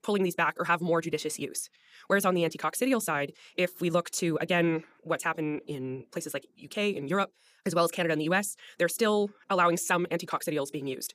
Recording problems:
wrong speed, natural pitch; too fast; 1.5 times normal speed

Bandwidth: 15 kHz